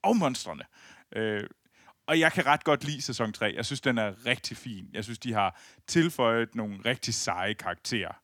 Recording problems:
none

